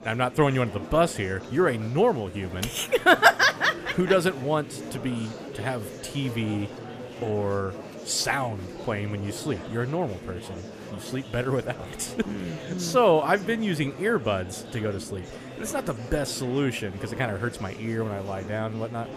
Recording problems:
murmuring crowd; noticeable; throughout; 15 dB below the speech

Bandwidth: 14.5 kHz